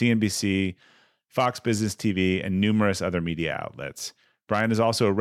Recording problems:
abrupt cut into speech; at the start and the end

